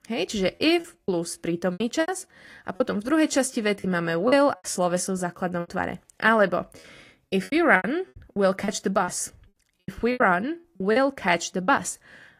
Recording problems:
garbled, watery; slightly; nothing above 15 kHz
choppy; very; 13% of the speech affected

